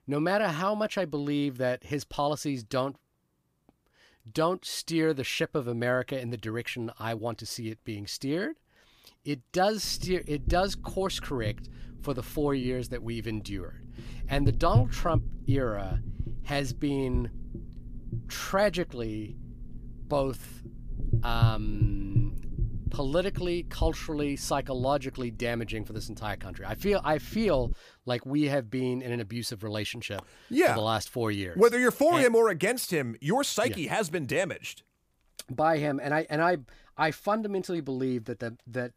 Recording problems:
low rumble; noticeable; from 10 to 28 s; 20 dB below the speech

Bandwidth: 15 kHz